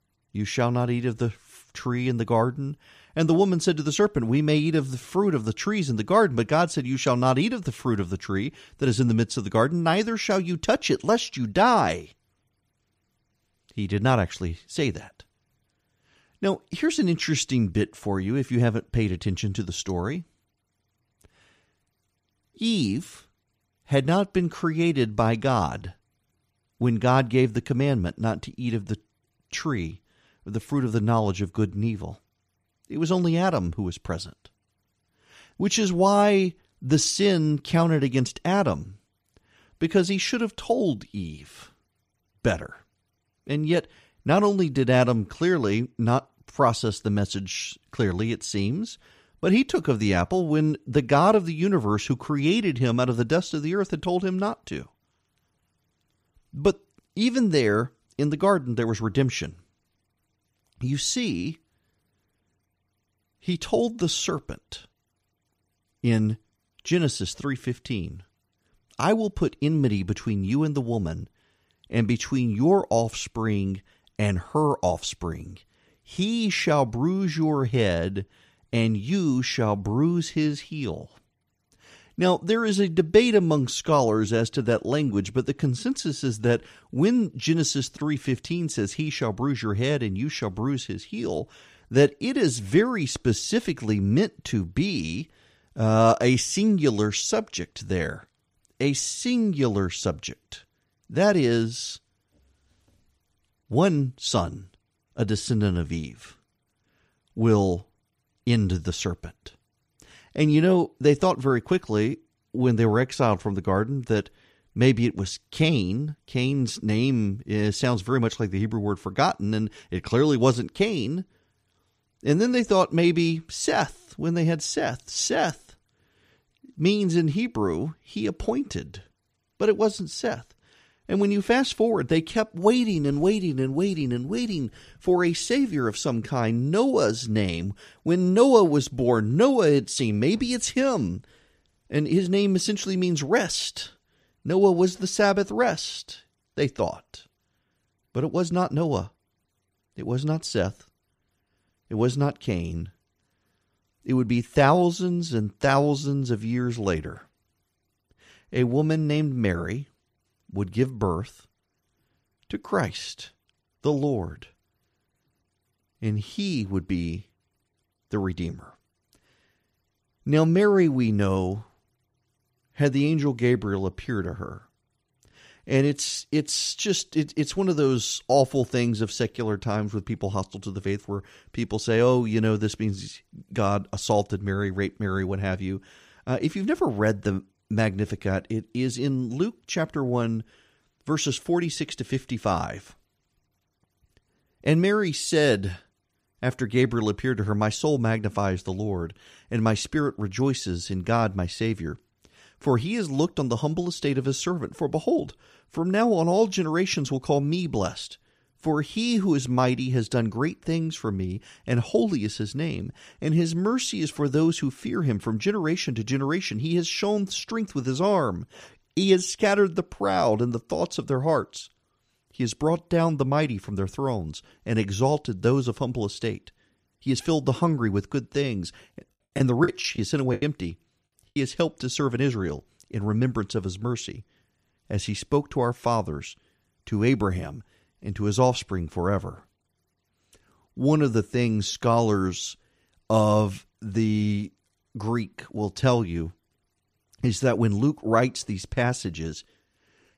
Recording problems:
choppy; very; from 3:49 to 3:51; 12% of the speech affected

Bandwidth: 14.5 kHz